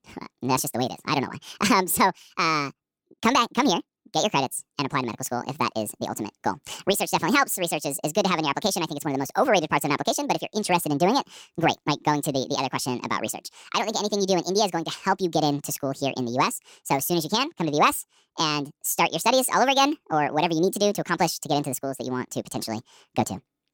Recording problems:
wrong speed and pitch; too fast and too high; 1.6 times normal speed

